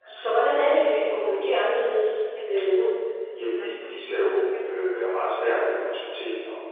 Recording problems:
room echo; strong; dies away in 2 s
off-mic speech; far
phone-call audio
background chatter; faint; throughout; 2 voices, 20 dB below the speech

